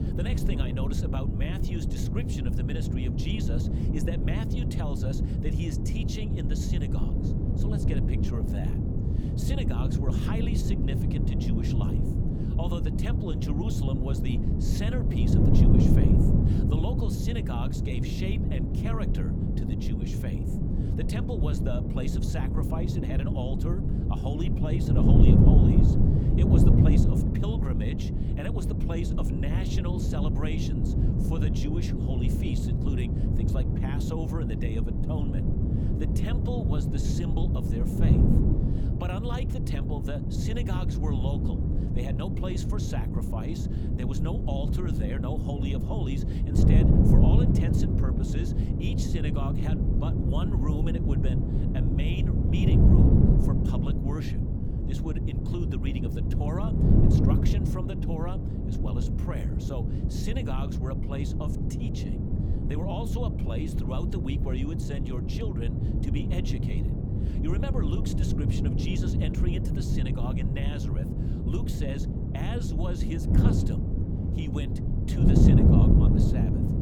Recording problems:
wind noise on the microphone; heavy; 4 dB above the speech

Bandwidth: 18.5 kHz